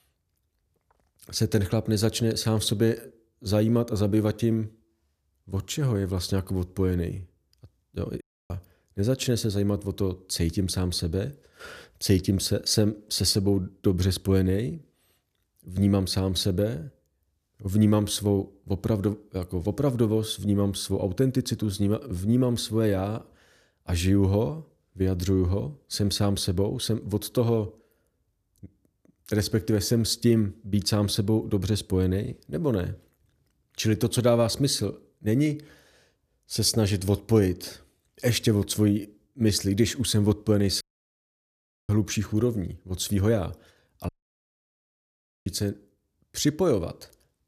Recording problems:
audio cutting out; at 8 s, at 41 s for 1 s and at 44 s for 1.5 s

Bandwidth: 14.5 kHz